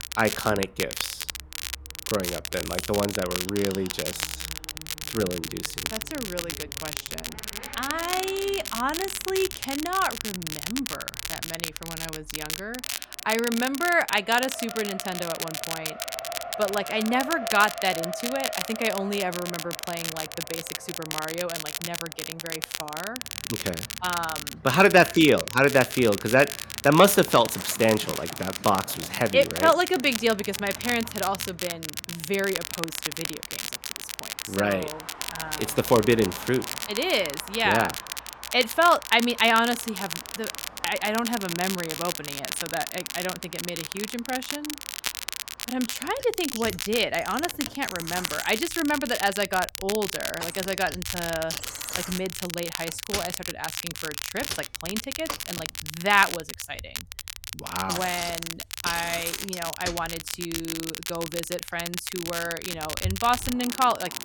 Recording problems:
crackle, like an old record; loud; 7 dB below the speech
traffic noise; noticeable; throughout; 15 dB below the speech

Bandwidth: 18 kHz